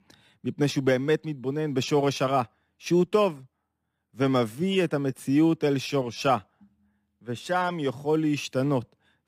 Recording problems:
none

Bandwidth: 15.5 kHz